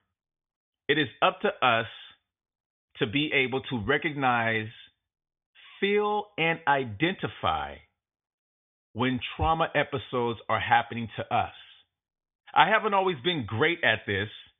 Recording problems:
high frequencies cut off; severe; nothing above 3.5 kHz

